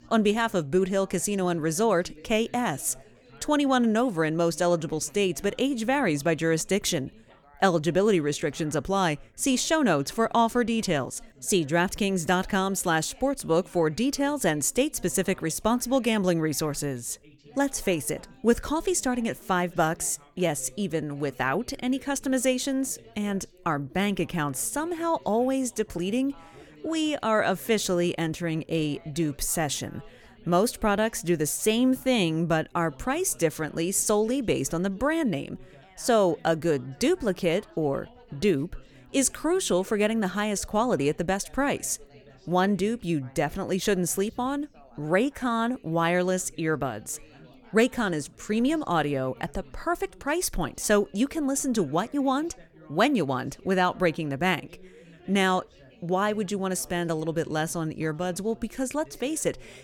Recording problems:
background chatter; faint; throughout; 3 voices, 25 dB below the speech

